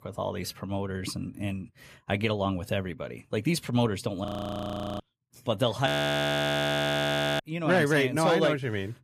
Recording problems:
audio freezing; at 4.5 s for 0.5 s and at 6 s for 1.5 s

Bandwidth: 14.5 kHz